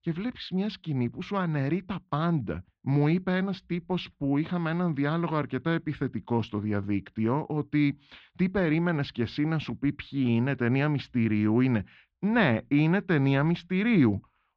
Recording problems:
muffled; very; fading above 3.5 kHz

